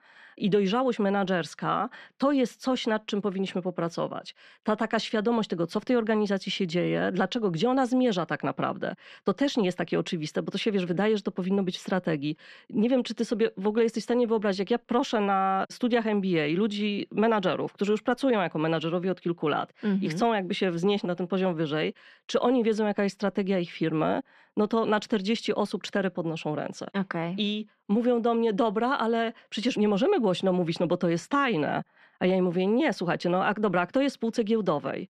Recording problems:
muffled; slightly; fading above 3 kHz

